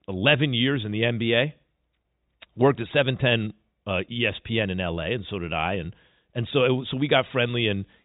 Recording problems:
high frequencies cut off; severe; nothing above 4 kHz

